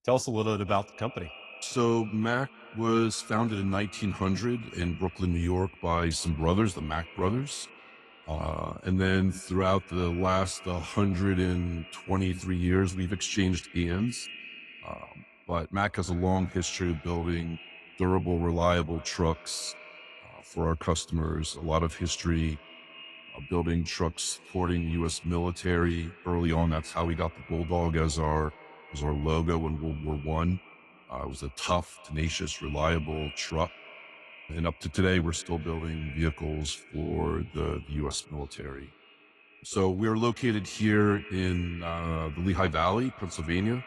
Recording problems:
echo of what is said; faint; throughout; 270 ms later, 20 dB below the speech
garbled, watery; slightly

